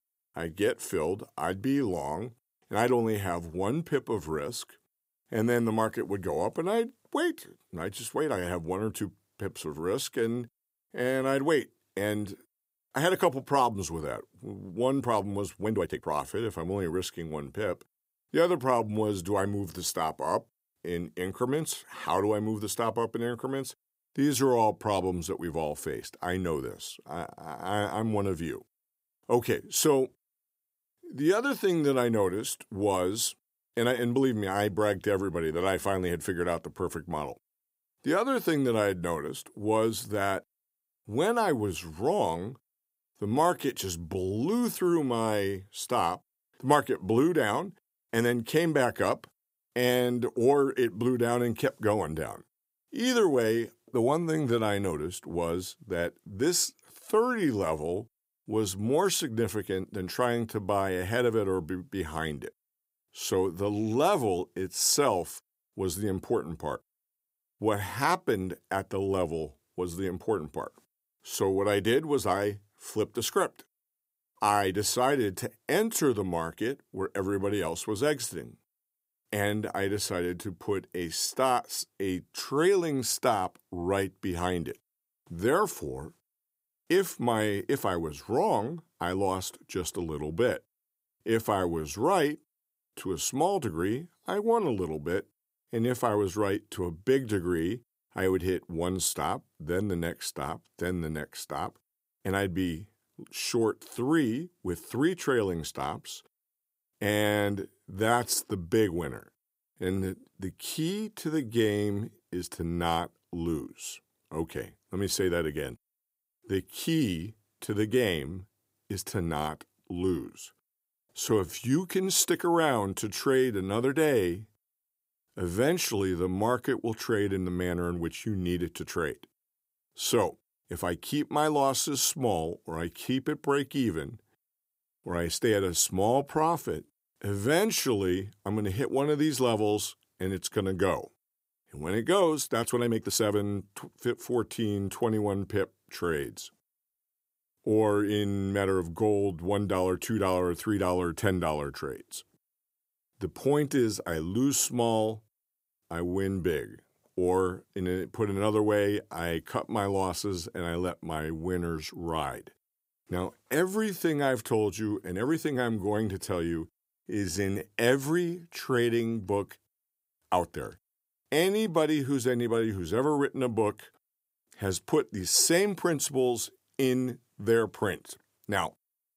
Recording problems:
uneven, jittery; strongly; from 16 s to 2:52

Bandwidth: 15.5 kHz